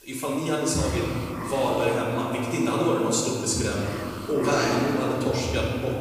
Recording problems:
off-mic speech; far
room echo; noticeable; dies away in 2.6 s
hiss; very faint; throughout; 10 dB below the speech

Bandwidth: 15 kHz